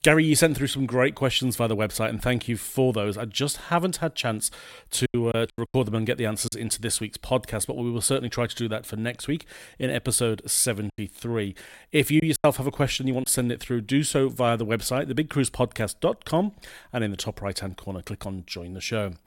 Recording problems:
choppy; very; from 5 to 6.5 s and from 11 to 13 s; 7% of the speech affected

